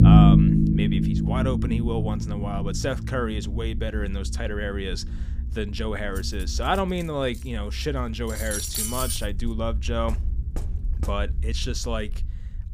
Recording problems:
low rumble; loud; throughout; 1 dB below the speech
clattering dishes; loud; from 6 to 9 s; peak 4 dB above the speech
door banging; faint; from 10 to 11 s; peak 10 dB below the speech

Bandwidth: 15 kHz